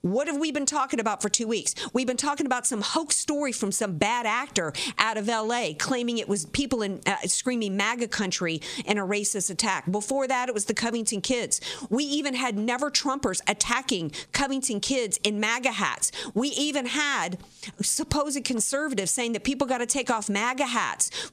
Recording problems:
squashed, flat; somewhat

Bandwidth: 14 kHz